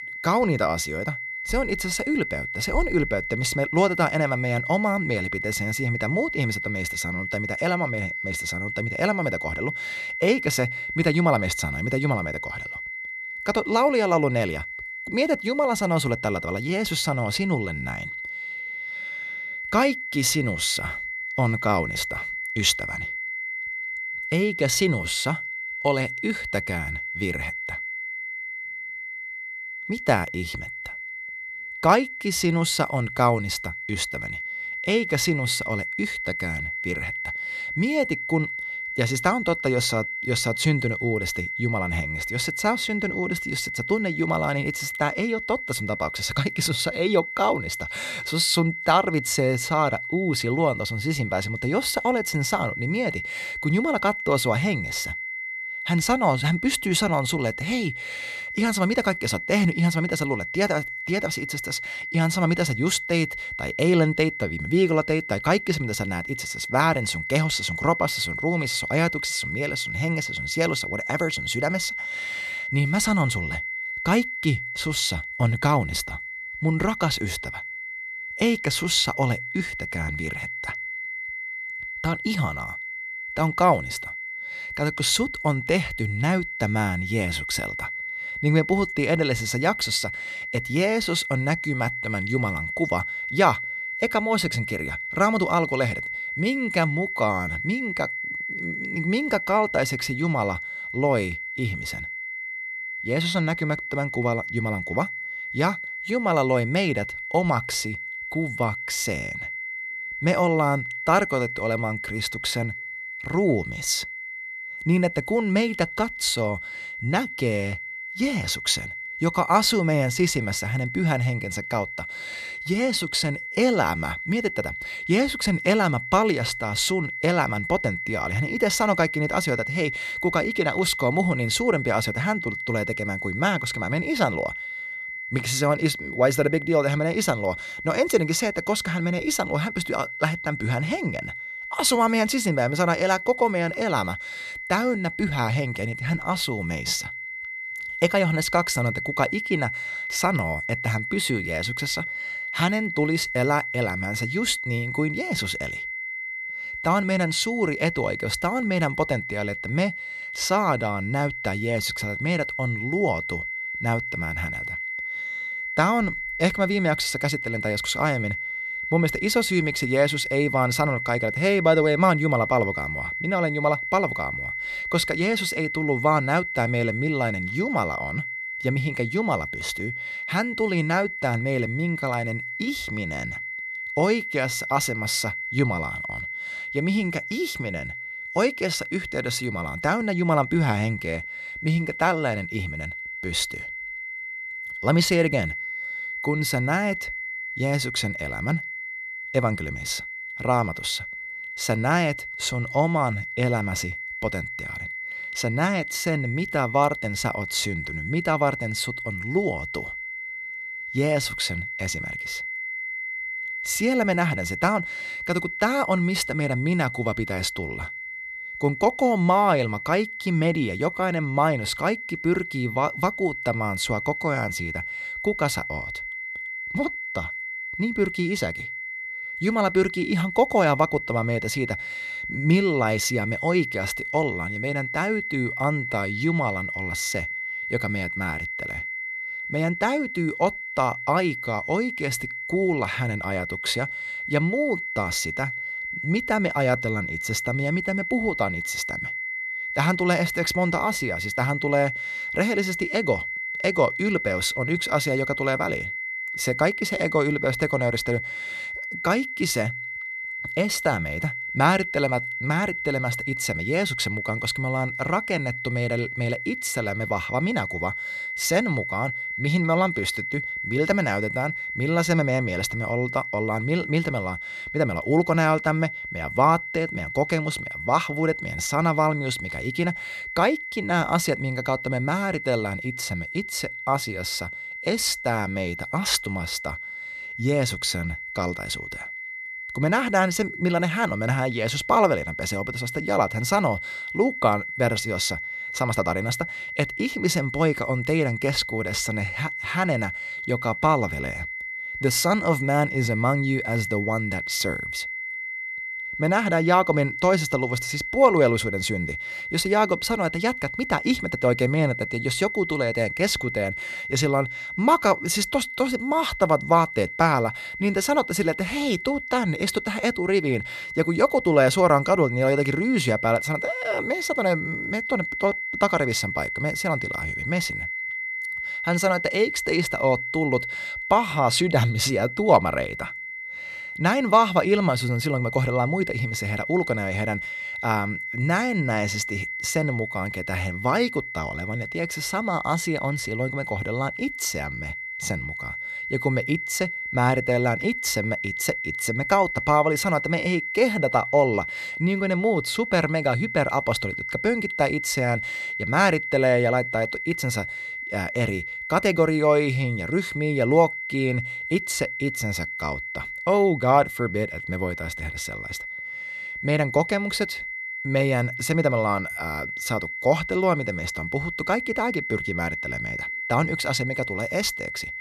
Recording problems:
high-pitched whine; loud; throughout; 2 kHz, 5 dB below the speech

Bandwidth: 13.5 kHz